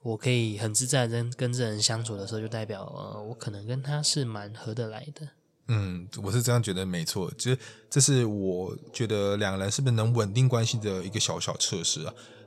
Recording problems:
background chatter; faint; throughout; 2 voices, 25 dB below the speech

